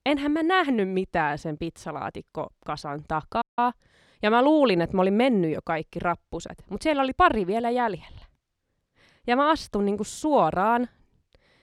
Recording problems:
audio cutting out; at 3.5 s

